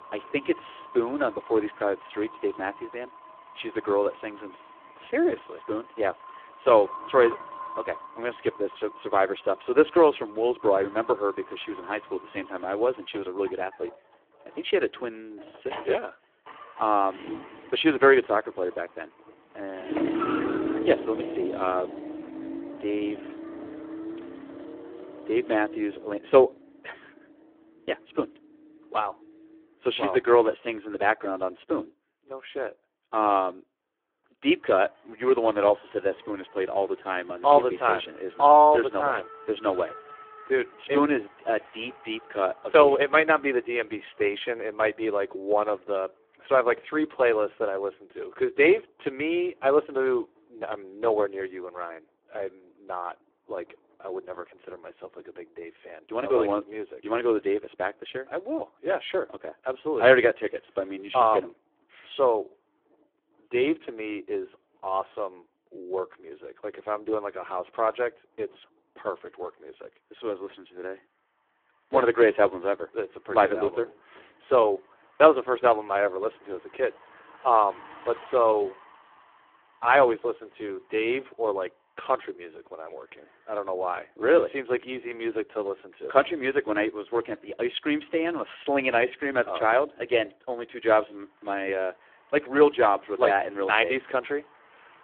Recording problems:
phone-call audio; poor line
traffic noise; noticeable; throughout; 15 dB below the speech

